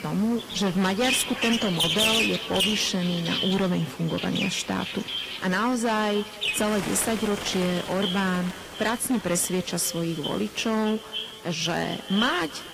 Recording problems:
distortion; heavy; 11% of the sound clipped
echo of what is said; strong; throughout; 280 ms later, 9 dB below the speech
garbled, watery; slightly
animal sounds; loud; throughout; 2 dB below the speech
hiss; noticeable; throughout; 20 dB below the speech

